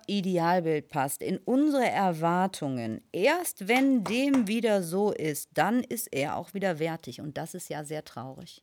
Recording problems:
none

